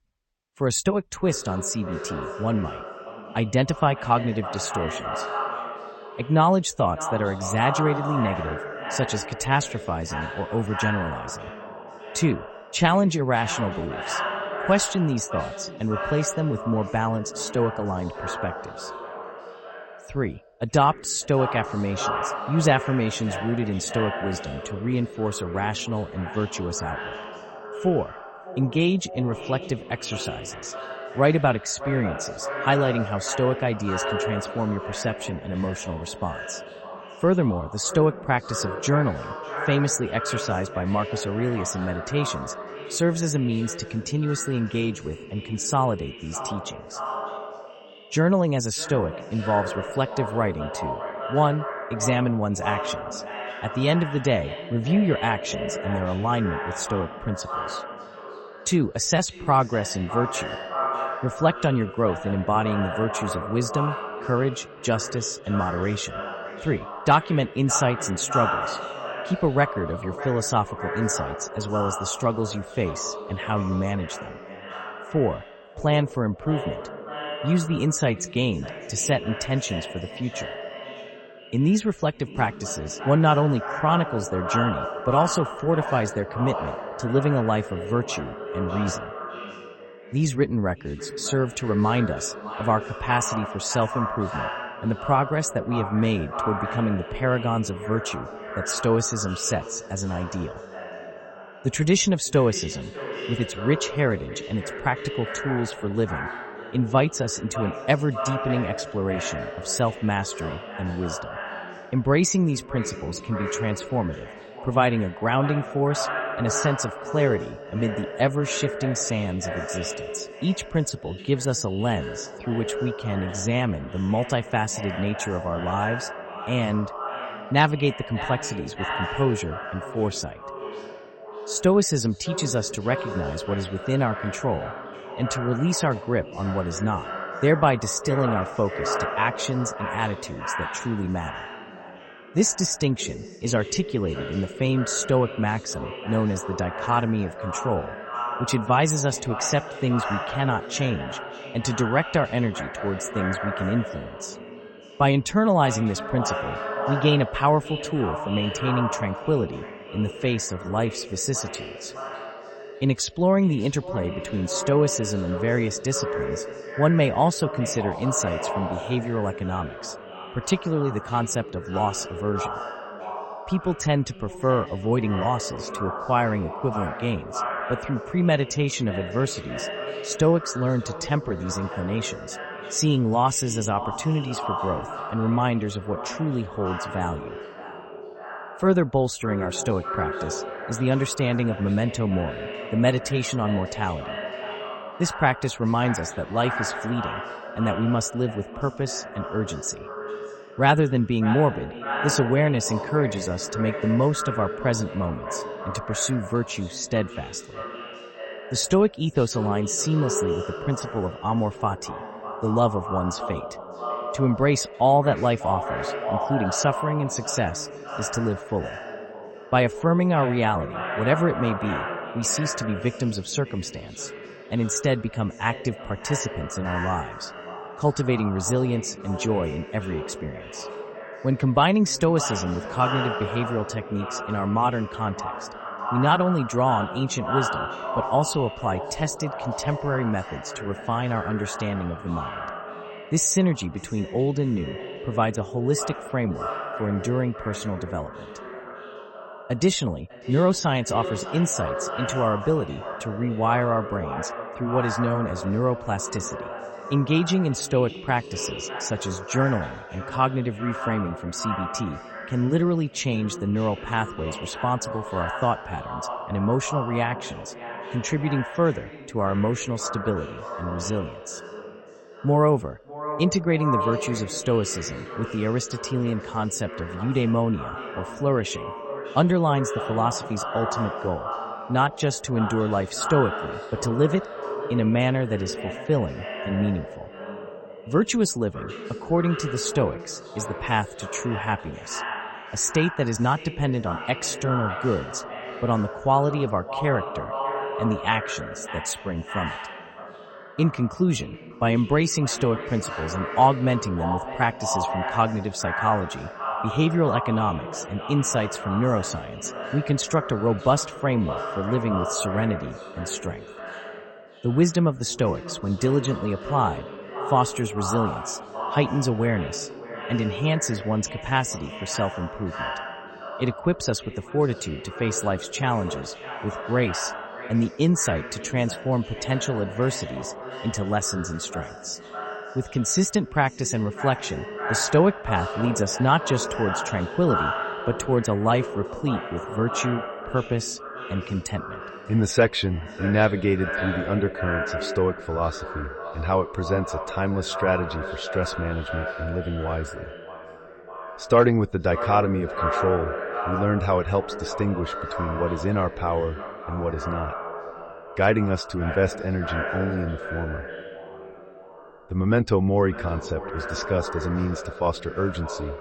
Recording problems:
echo of what is said; strong; throughout; 600 ms later, 8 dB below the speech

